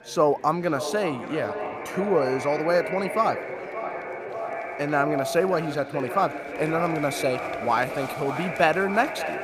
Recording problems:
echo of what is said; strong; throughout; 580 ms later, 7 dB below the speech
murmuring crowd; noticeable; throughout; 15 dB below the speech

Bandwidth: 14.5 kHz